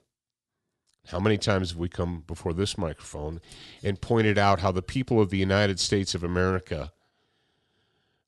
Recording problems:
none

